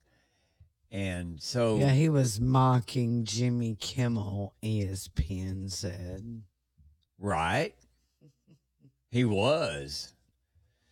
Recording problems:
wrong speed, natural pitch; too slow; 0.7 times normal speed

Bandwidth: 17.5 kHz